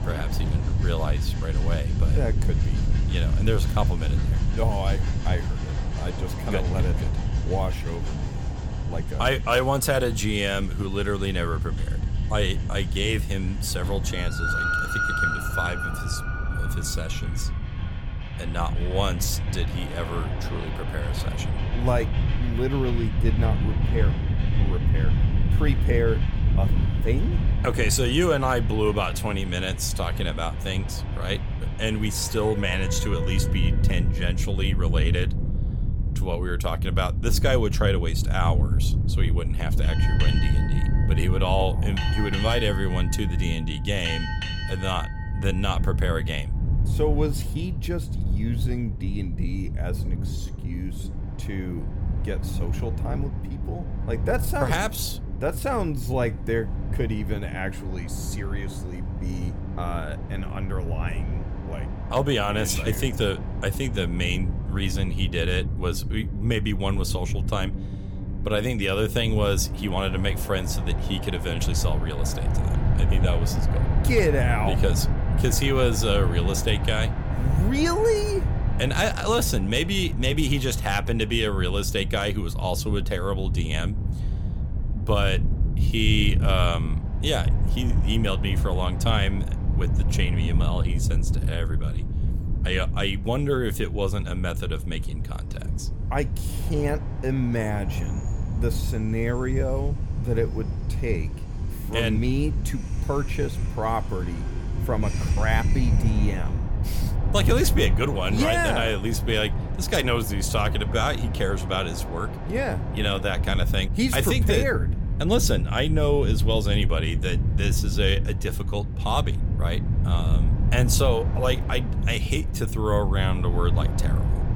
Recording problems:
train or aircraft noise; noticeable; throughout; 10 dB below the speech
wind noise on the microphone; occasional gusts; 15 dB below the speech

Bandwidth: 18 kHz